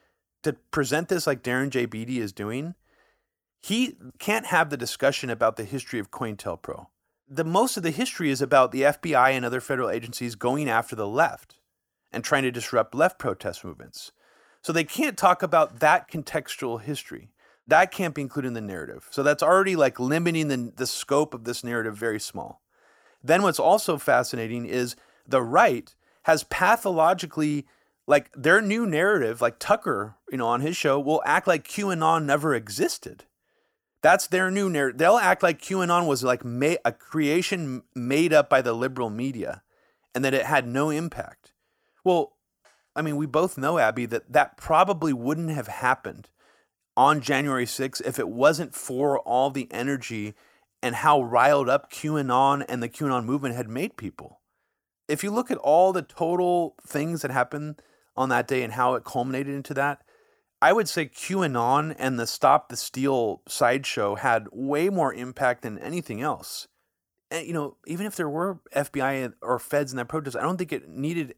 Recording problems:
none

